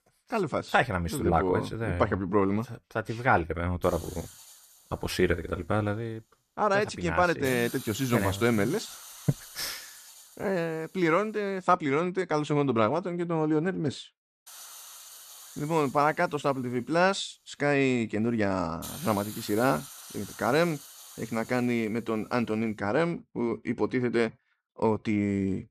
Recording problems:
hiss; noticeable; from 4 to 12 s and from 14 to 23 s; 15 dB below the speech

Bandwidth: 14.5 kHz